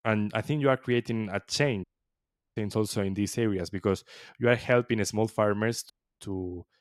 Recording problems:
audio cutting out; at 2 s for 0.5 s and at 6 s

